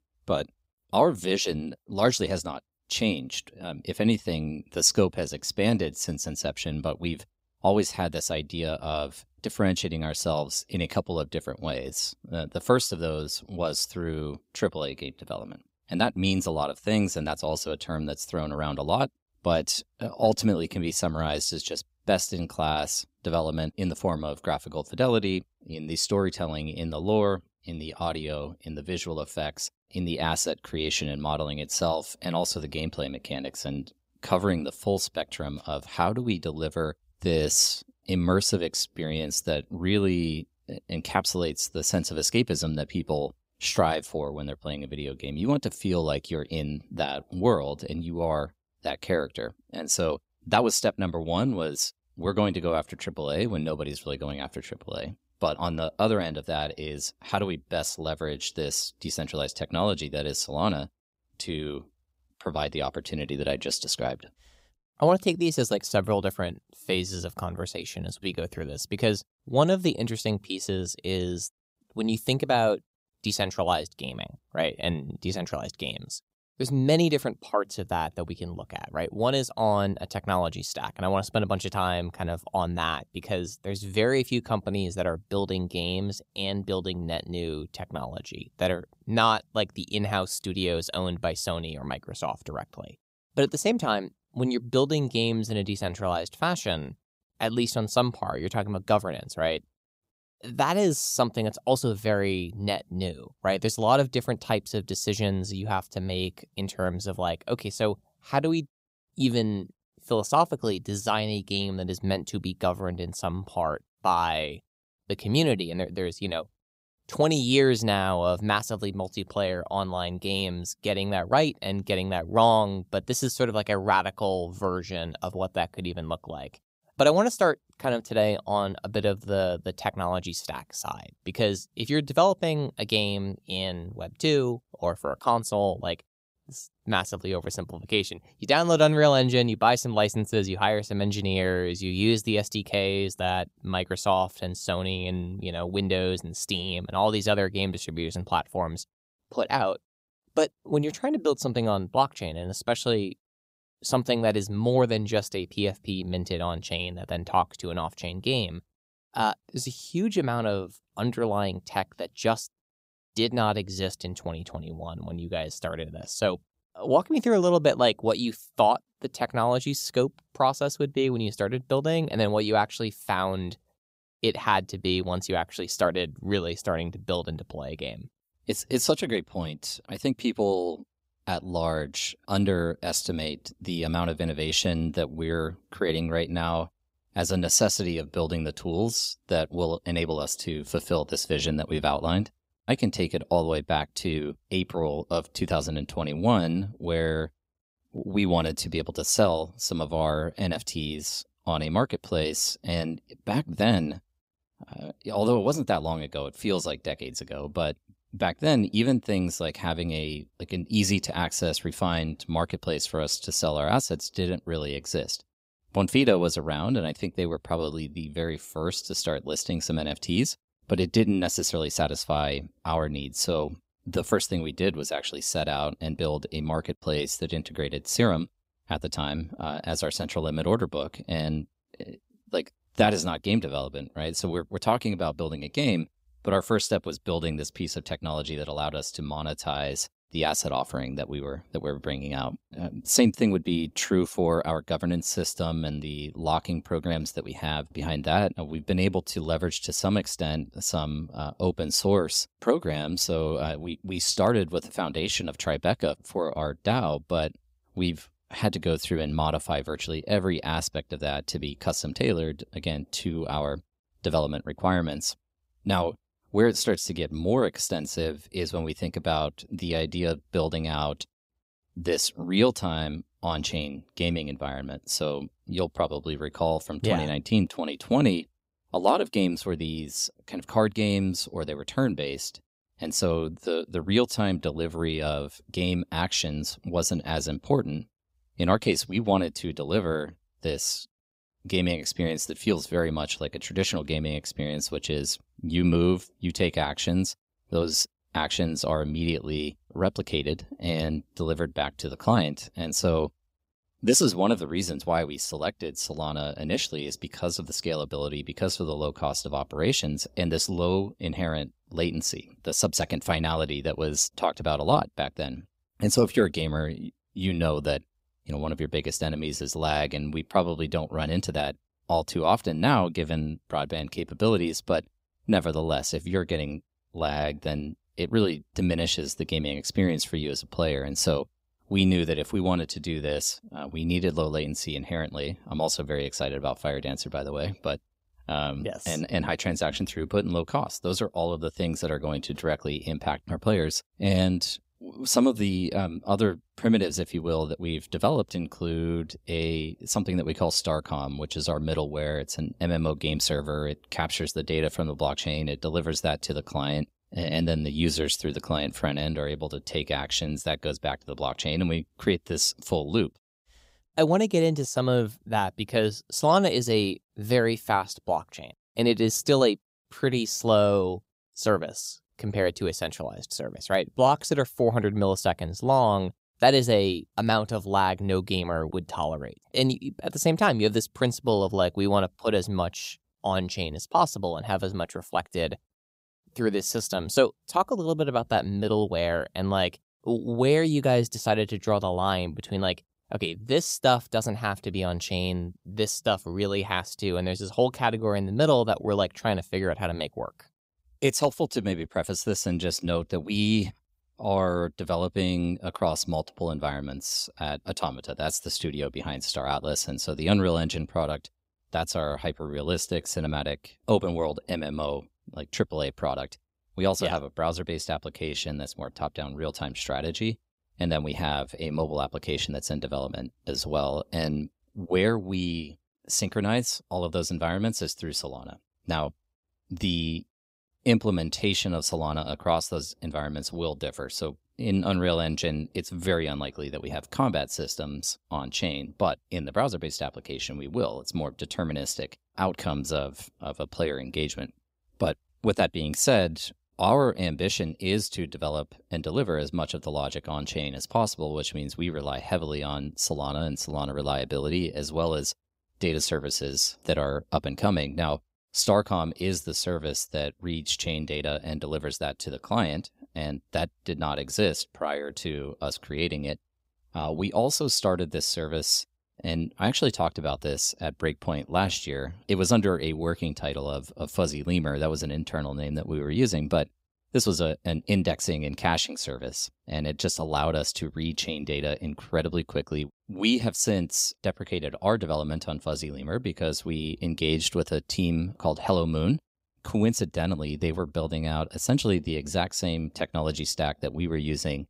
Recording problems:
none

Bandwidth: 15.5 kHz